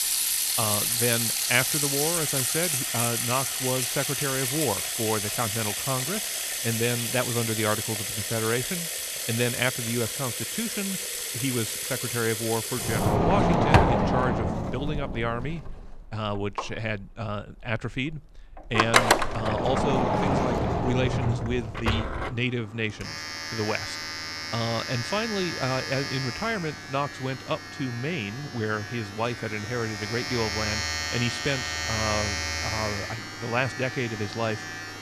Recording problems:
household noises; very loud; throughout; 3 dB above the speech

